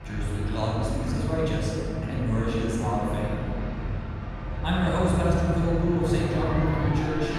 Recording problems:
room echo; strong; dies away in 3 s
off-mic speech; far
traffic noise; loud; throughout; 4 dB below the speech
murmuring crowd; faint; throughout; 30 dB below the speech

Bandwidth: 15 kHz